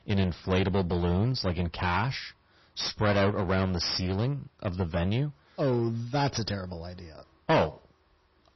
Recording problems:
distortion; heavy; 9% of the sound clipped
garbled, watery; slightly; nothing above 6 kHz

